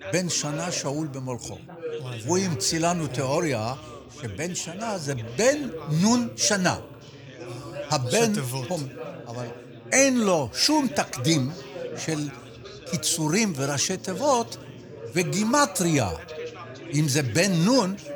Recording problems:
background chatter; noticeable; throughout; 4 voices, 15 dB below the speech

